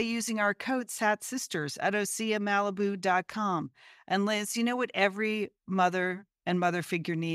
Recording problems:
abrupt cut into speech; at the start and the end

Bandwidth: 15.5 kHz